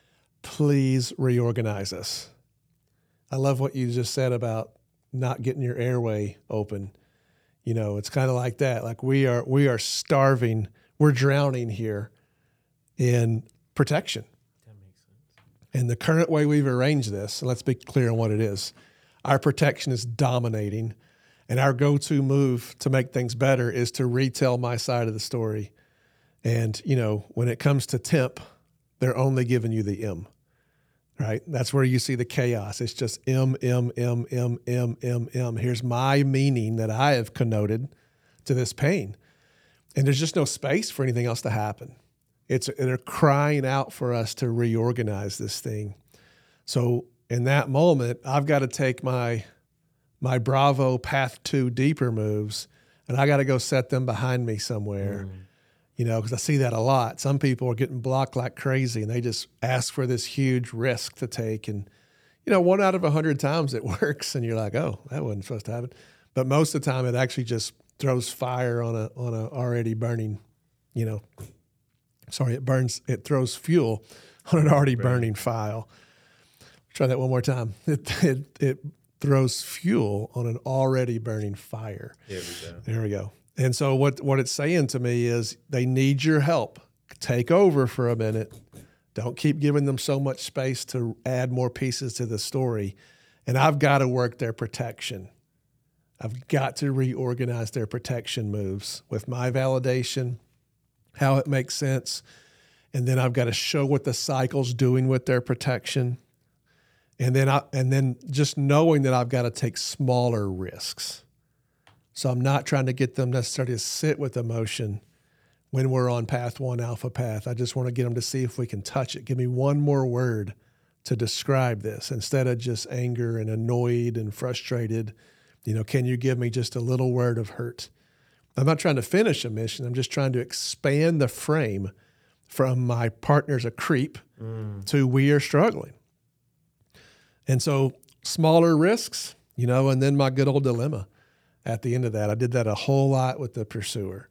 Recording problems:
none

